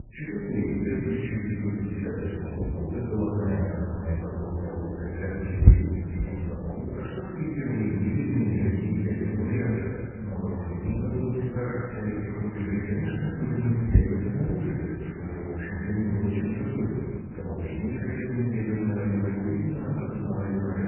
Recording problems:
room echo; strong; dies away in 2 s
off-mic speech; far
garbled, watery; badly; nothing above 2.5 kHz
rain or running water; very faint; throughout; 20 dB below the speech
low rumble; very faint; until 6.5 s and from 10 to 17 s; 10 dB below the speech

